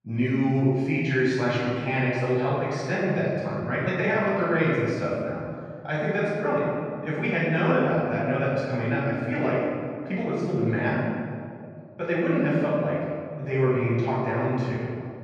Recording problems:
room echo; strong; dies away in 2 s
off-mic speech; far
muffled; slightly; fading above 2.5 kHz

